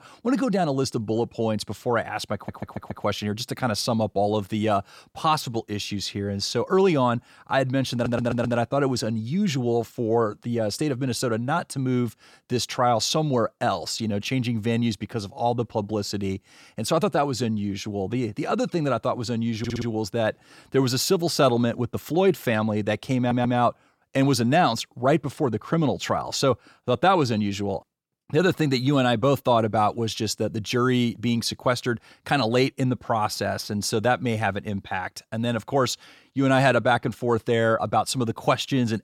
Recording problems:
audio stuttering; 4 times, first at 2.5 s

